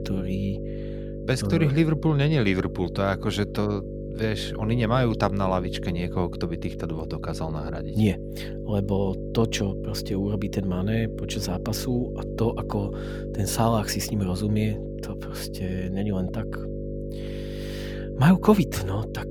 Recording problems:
electrical hum; loud; throughout; 50 Hz, 9 dB below the speech

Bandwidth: 18.5 kHz